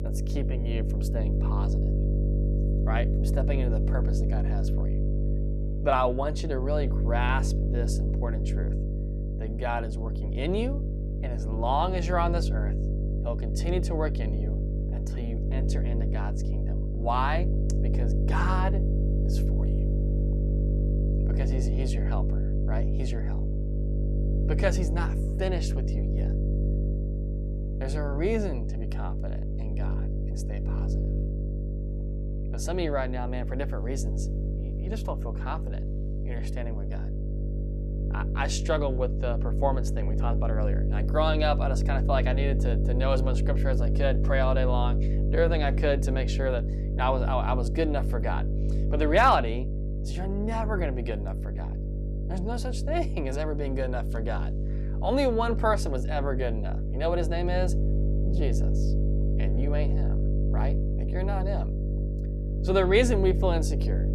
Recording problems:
electrical hum; loud; throughout; 50 Hz, 10 dB below the speech

